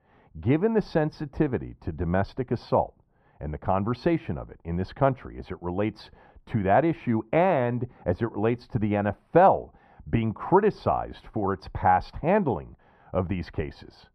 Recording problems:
muffled; very; fading above 2 kHz

